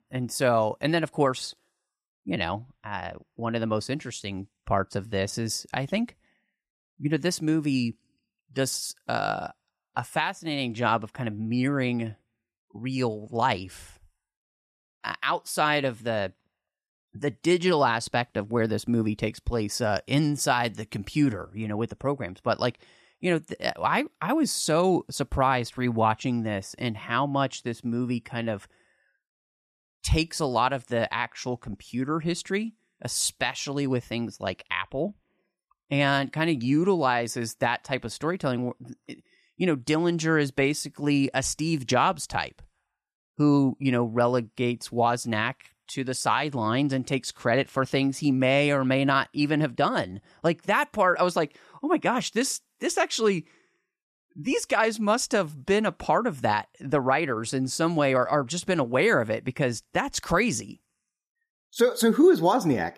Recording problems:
none

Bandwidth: 14.5 kHz